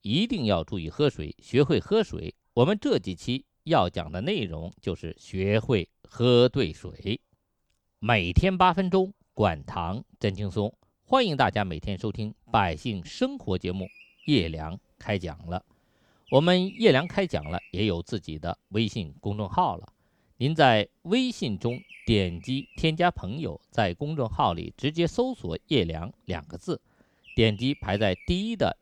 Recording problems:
animal sounds; faint; throughout; 20 dB below the speech

